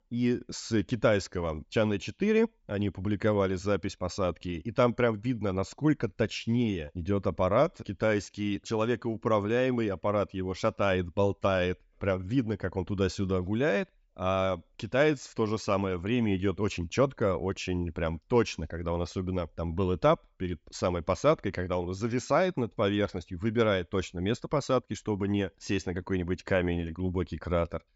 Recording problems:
high frequencies cut off; noticeable; nothing above 8 kHz

